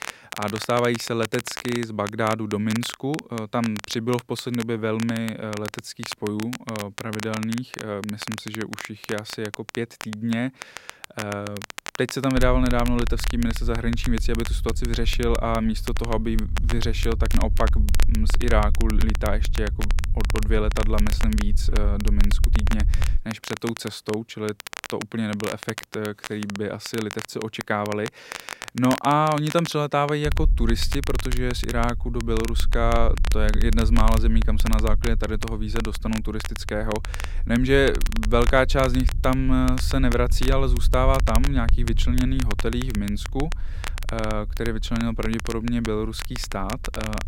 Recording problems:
crackle, like an old record; noticeable; 10 dB below the speech
low rumble; faint; from 12 to 23 s and from 30 s on; 20 dB below the speech

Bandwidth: 16 kHz